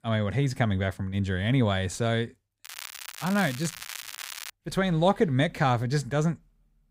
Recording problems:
crackling; noticeable; from 2.5 to 4.5 s; 10 dB below the speech

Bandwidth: 15.5 kHz